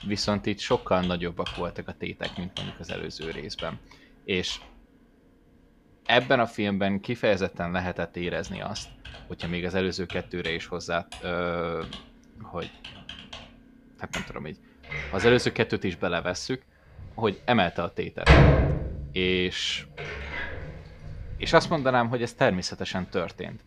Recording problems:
household noises; loud; throughout; 2 dB below the speech

